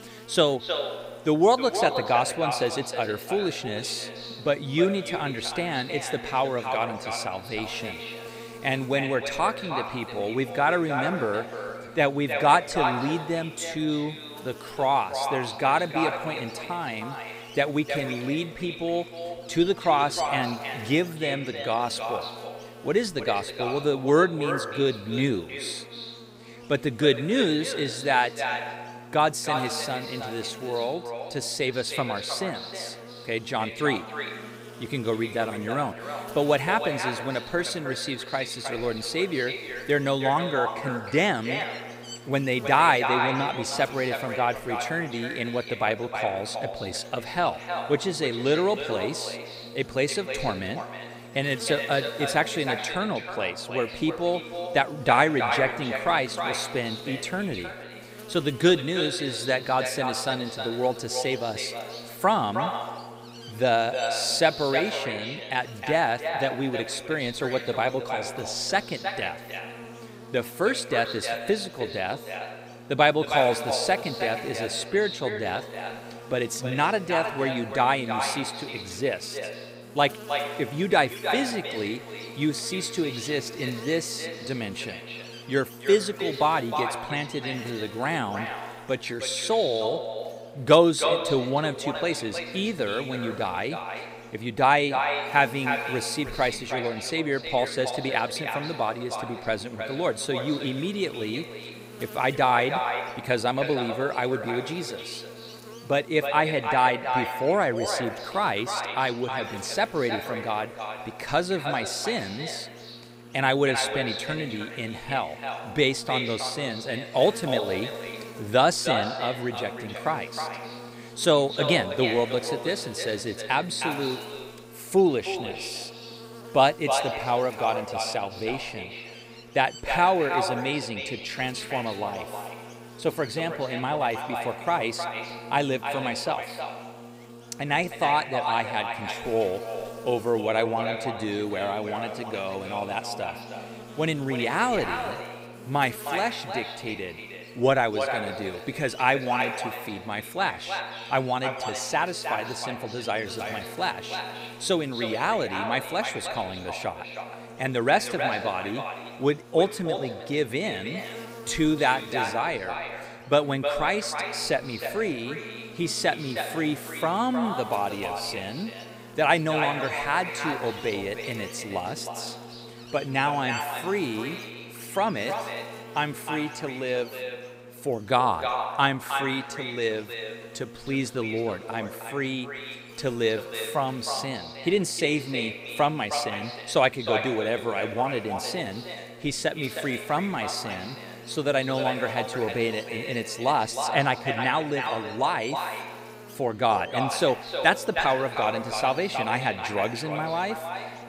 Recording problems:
echo of what is said; strong; throughout; 310 ms later, 6 dB below the speech
electrical hum; noticeable; throughout; 60 Hz, 20 dB below the speech

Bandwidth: 15.5 kHz